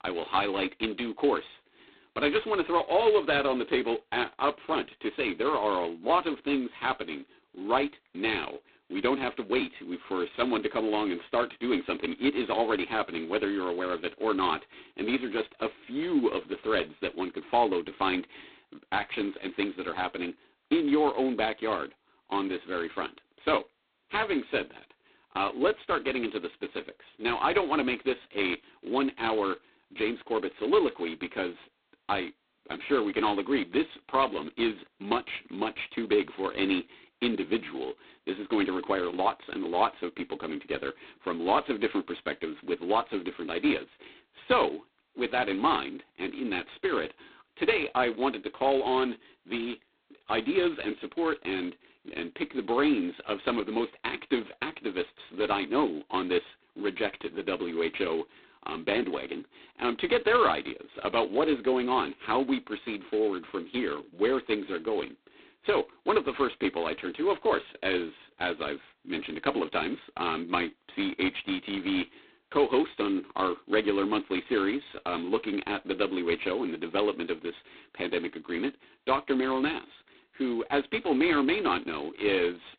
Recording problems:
phone-call audio; poor line; nothing above 4 kHz

